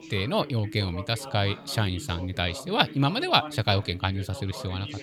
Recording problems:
background chatter; noticeable; throughout; 2 voices, 15 dB below the speech

